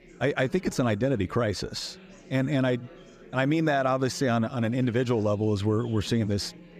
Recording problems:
chatter from many people; faint; throughout; 20 dB below the speech

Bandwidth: 15 kHz